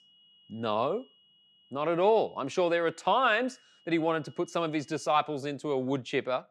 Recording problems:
high-pitched whine; faint; until 5 s; 3 kHz, 30 dB below the speech

